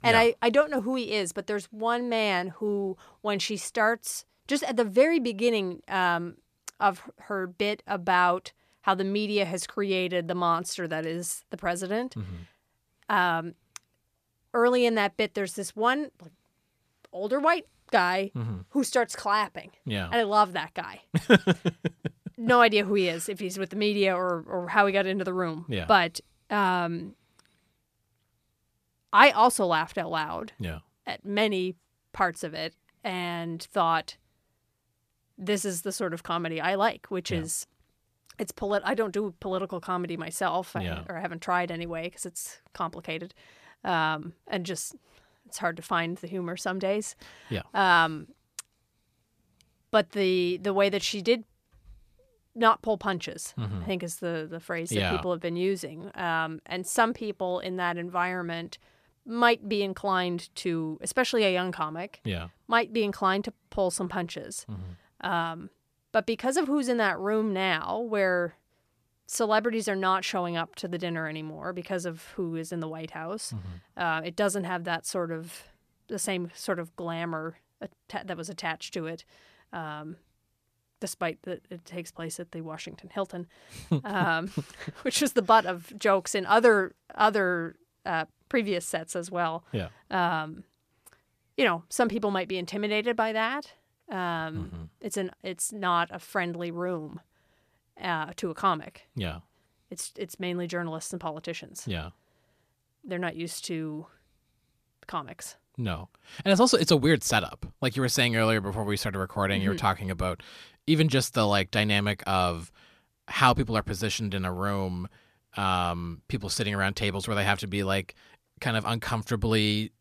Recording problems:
none

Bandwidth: 14.5 kHz